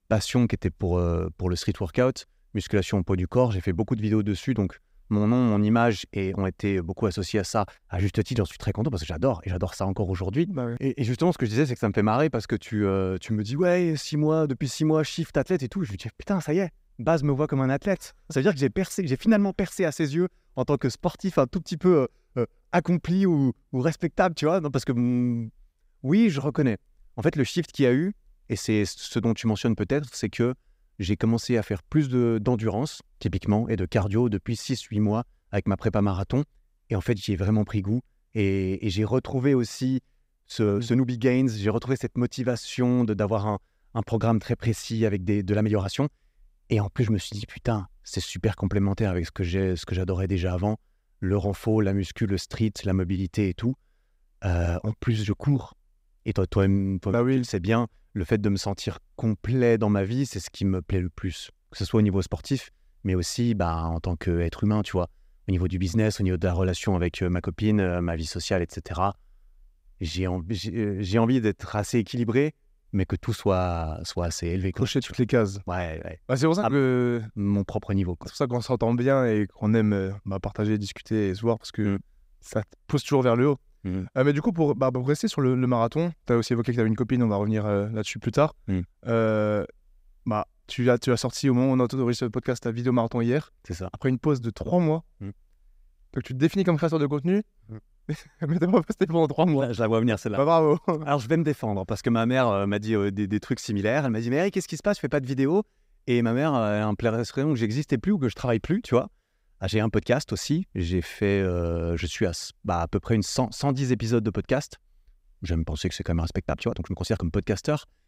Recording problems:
uneven, jittery; strongly; from 26 s to 1:57

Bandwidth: 15.5 kHz